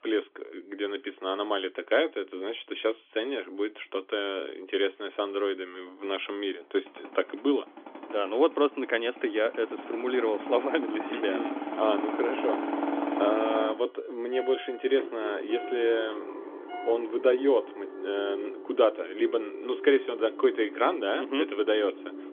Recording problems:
phone-call audio; nothing above 3.5 kHz
traffic noise; loud; throughout; 8 dB below the speech

